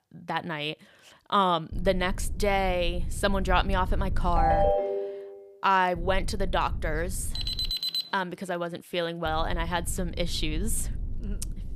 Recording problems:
low rumble; faint; from 1.5 to 4.5 s, from 6 to 7.5 s and from 9.5 s on; 25 dB below the speech
phone ringing; loud; at 4.5 s; peak 5 dB above the speech
alarm; loud; at 7.5 s; peak 1 dB above the speech

